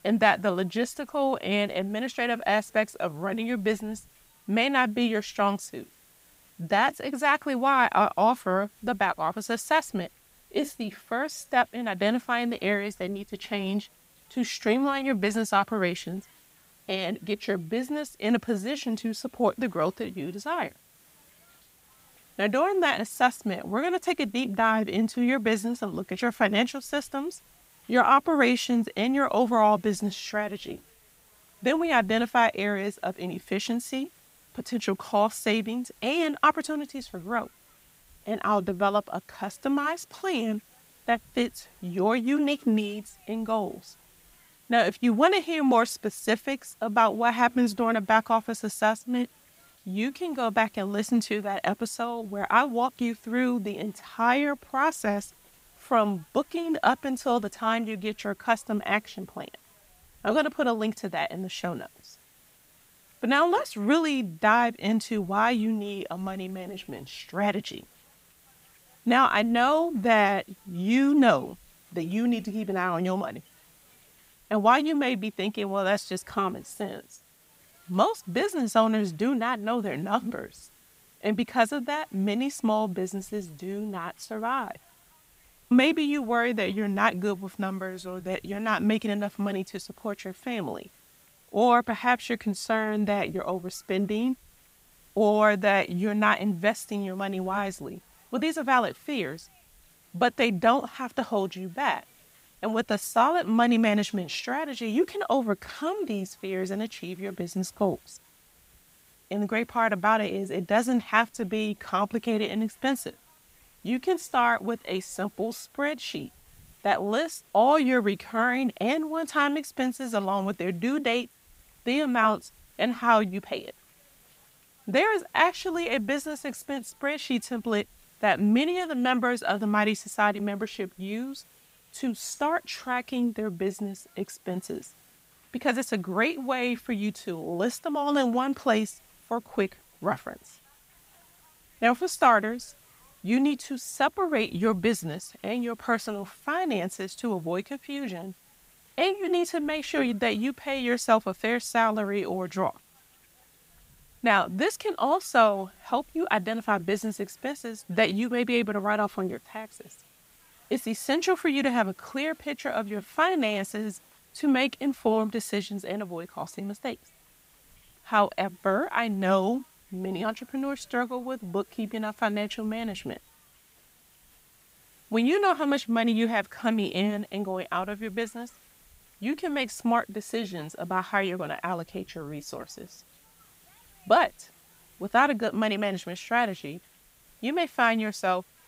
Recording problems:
hiss; faint; throughout; 30 dB below the speech

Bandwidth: 15.5 kHz